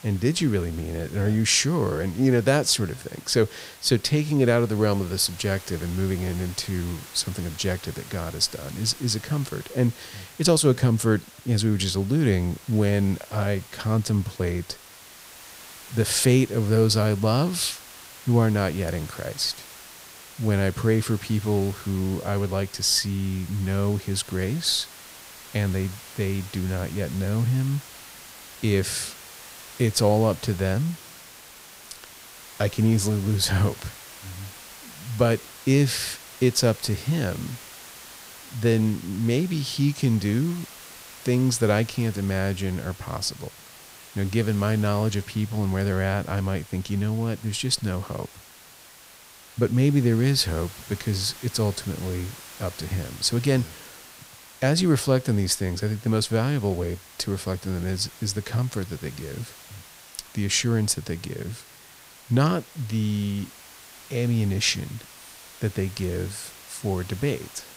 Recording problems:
hiss; noticeable; throughout; 20 dB below the speech

